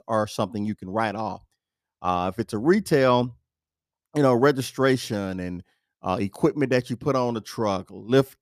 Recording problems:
none

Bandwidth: 14.5 kHz